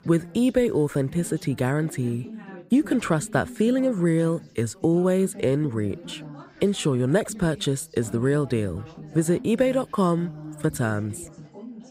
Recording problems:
background chatter; noticeable; throughout; 3 voices, 20 dB below the speech

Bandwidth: 15.5 kHz